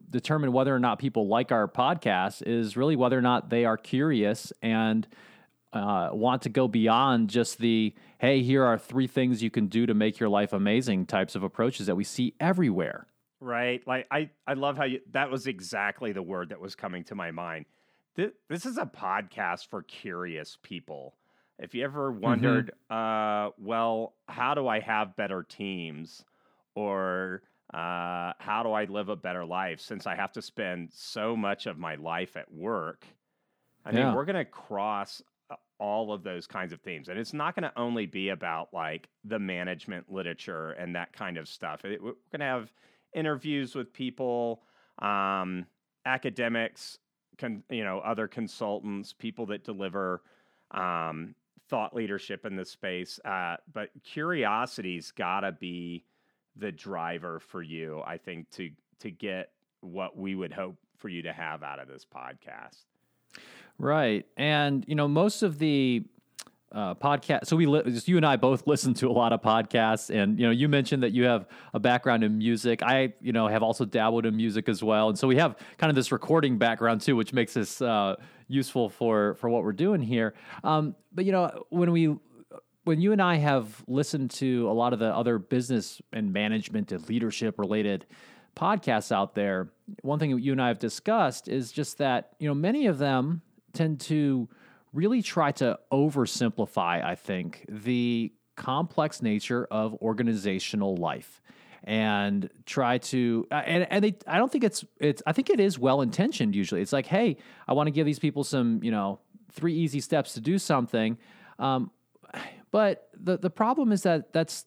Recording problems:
none

